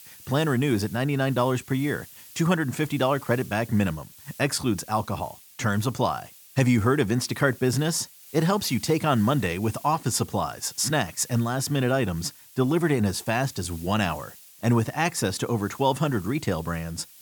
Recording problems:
hiss; noticeable; throughout; 20 dB below the speech

